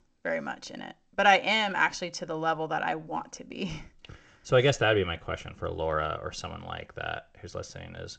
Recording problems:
garbled, watery; slightly; nothing above 7.5 kHz

